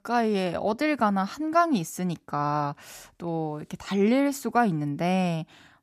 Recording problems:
none

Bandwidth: 14.5 kHz